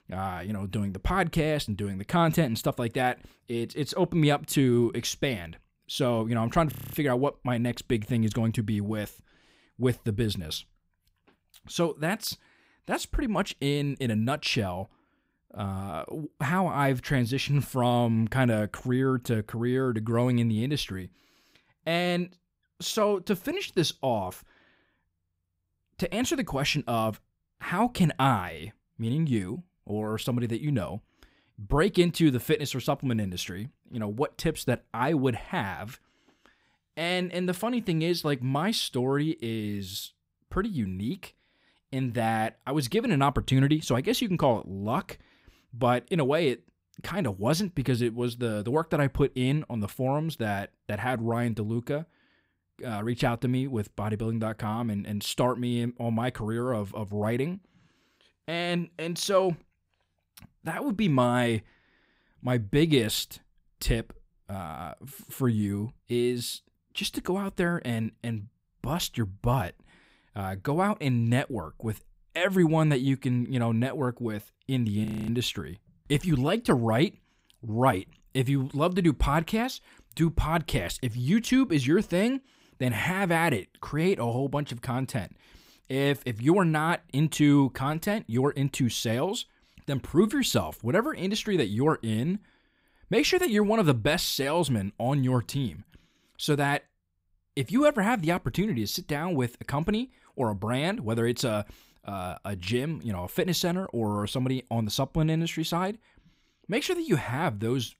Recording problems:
audio freezing; at 6.5 s and at 1:15

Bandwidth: 15.5 kHz